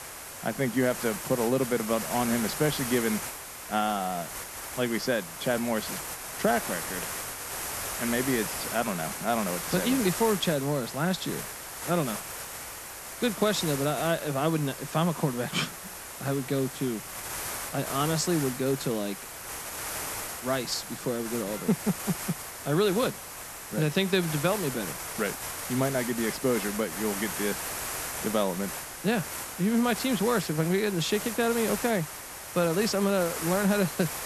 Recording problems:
hiss; loud; throughout; 6 dB below the speech

